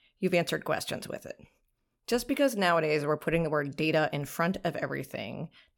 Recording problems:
none

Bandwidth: 17.5 kHz